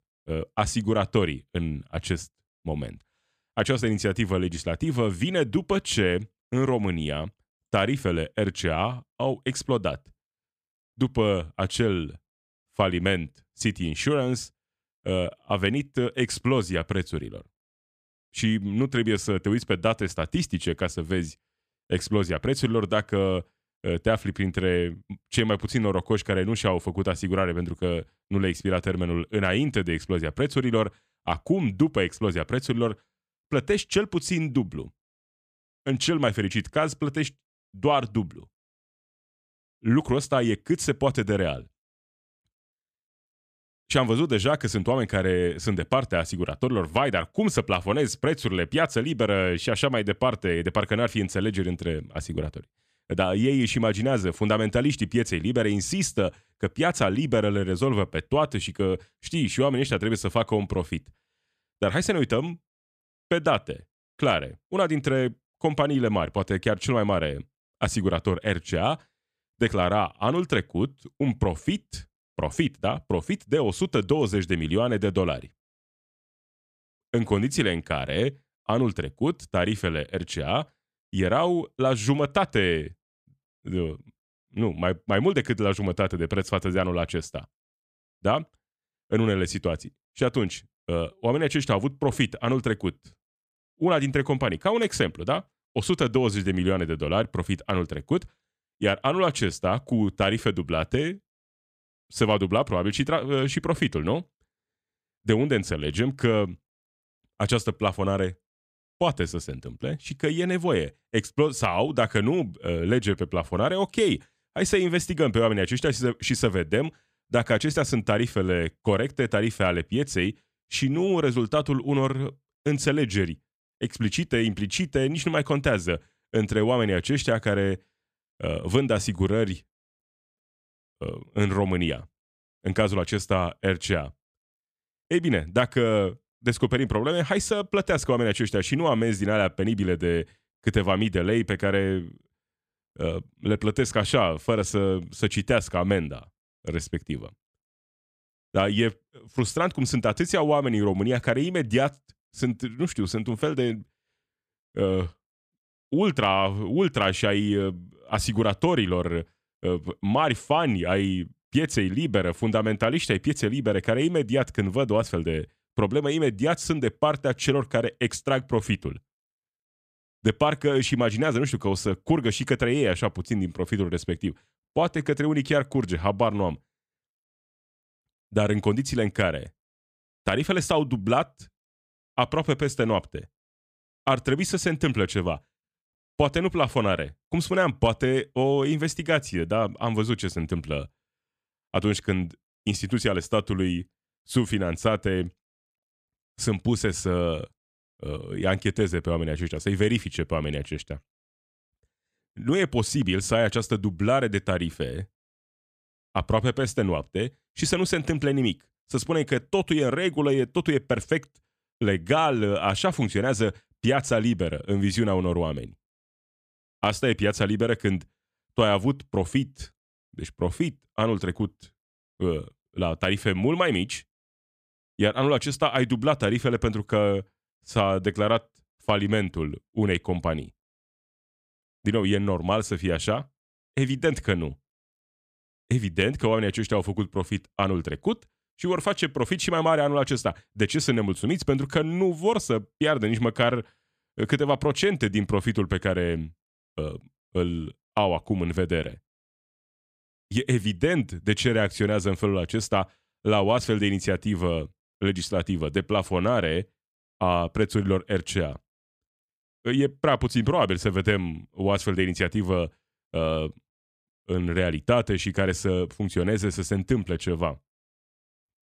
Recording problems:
none

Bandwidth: 14.5 kHz